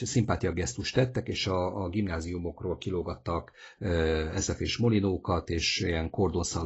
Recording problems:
garbled, watery; badly; nothing above 8 kHz
abrupt cut into speech; at the start and the end

